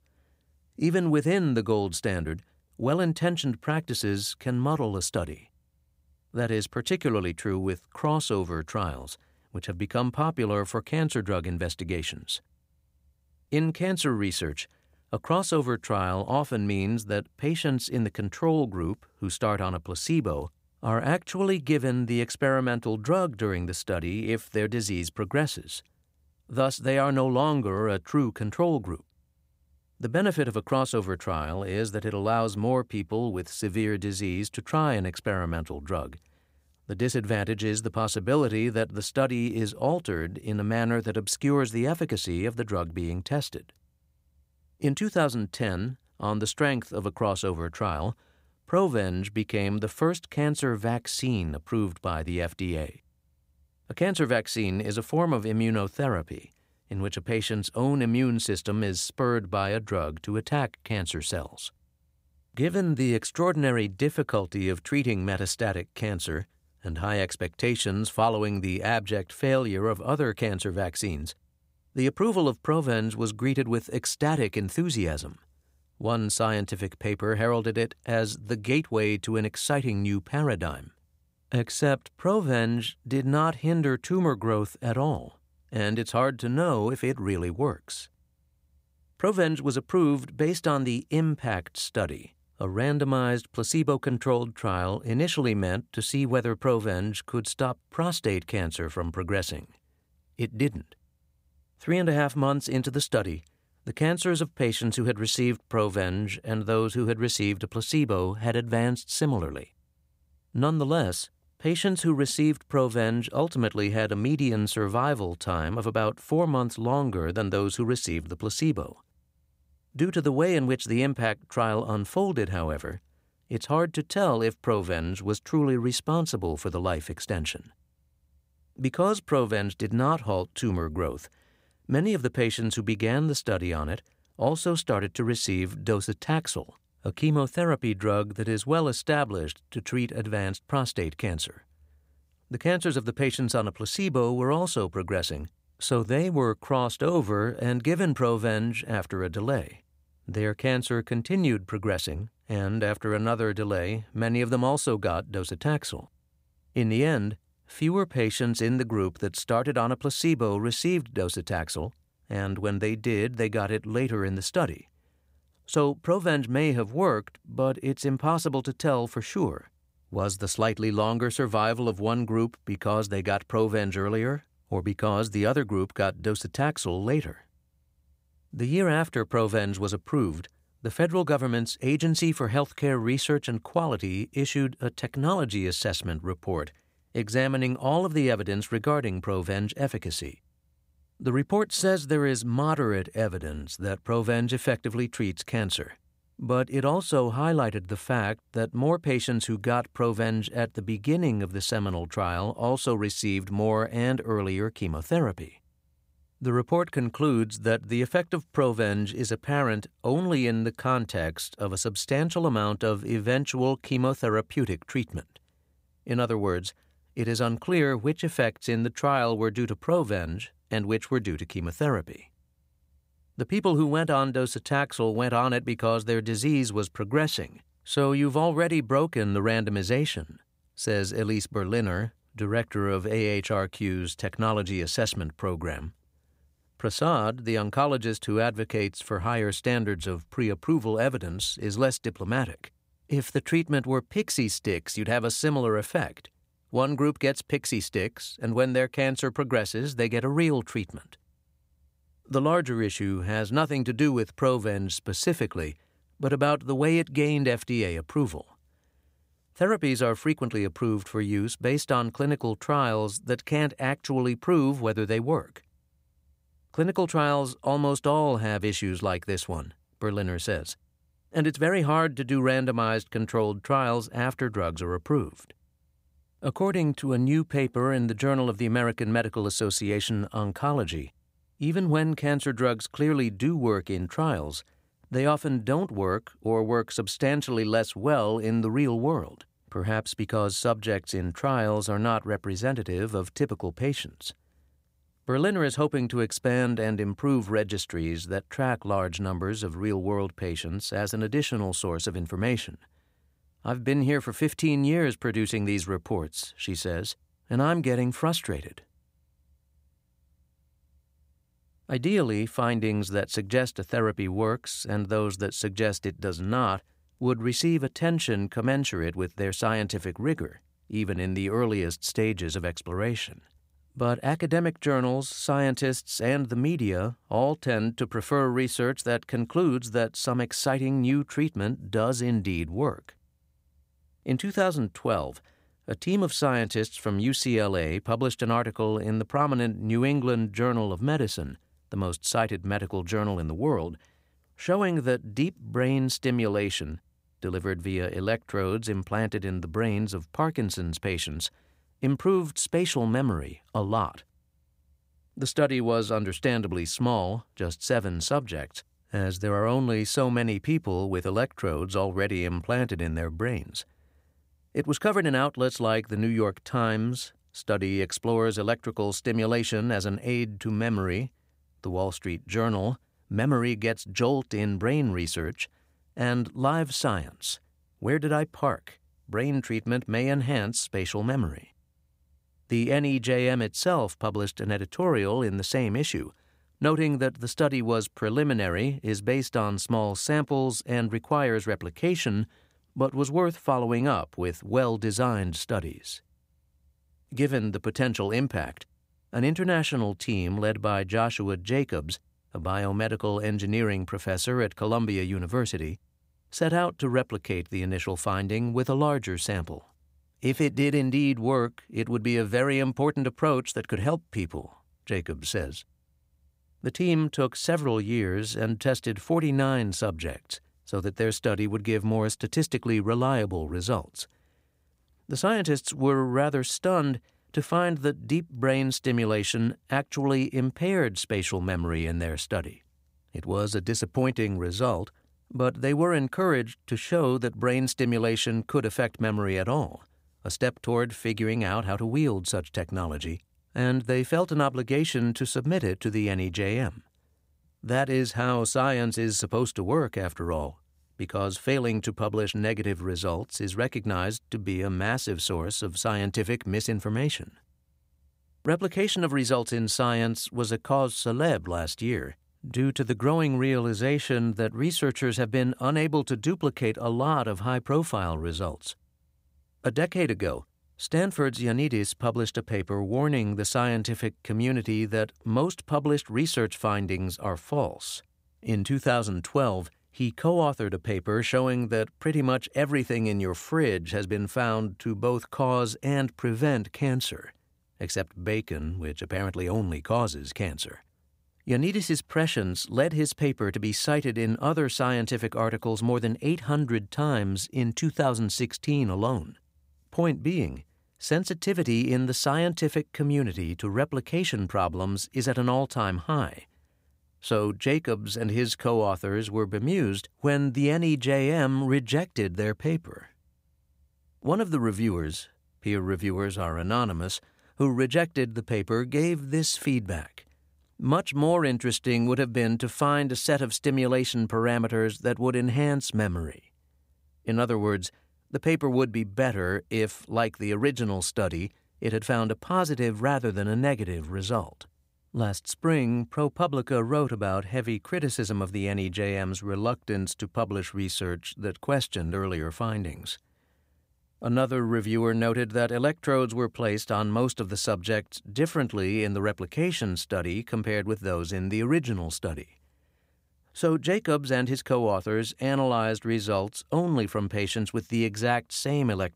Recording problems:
none

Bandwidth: 15.5 kHz